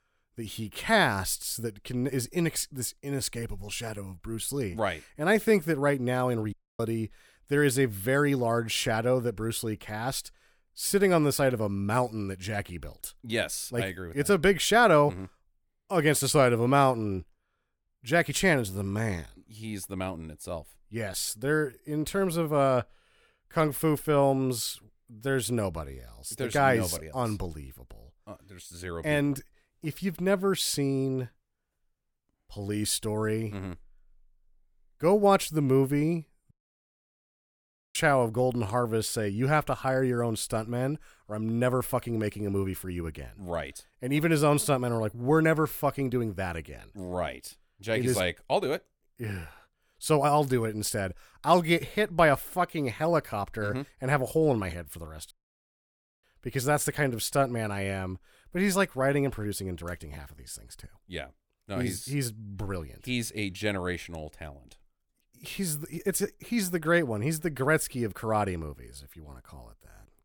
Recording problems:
audio cutting out; at 6.5 s, at 37 s for 1.5 s and at 55 s for 1 s

